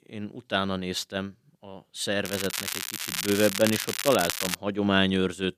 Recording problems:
crackling; loud; from 2.5 to 4.5 s; 3 dB below the speech

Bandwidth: 14.5 kHz